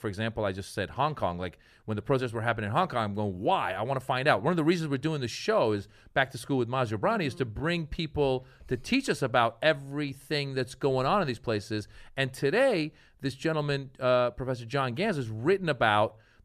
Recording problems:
none

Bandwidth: 14.5 kHz